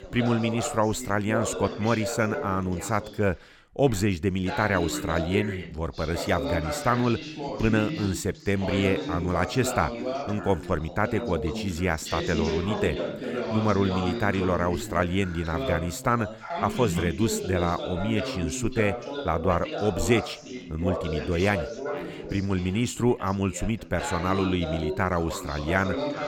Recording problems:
background chatter; loud; throughout; 2 voices, 6 dB below the speech

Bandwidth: 17 kHz